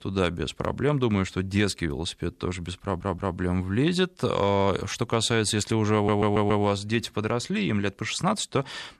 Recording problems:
audio stuttering; at 3 s and at 6 s

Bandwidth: 14 kHz